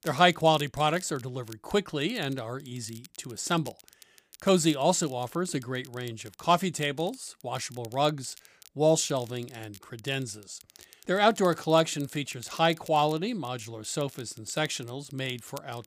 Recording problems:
crackle, like an old record; faint; 25 dB below the speech

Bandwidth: 15 kHz